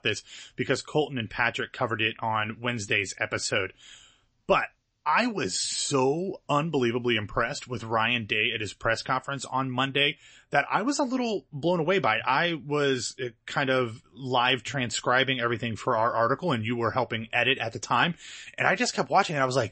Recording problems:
garbled, watery; slightly; nothing above 8 kHz

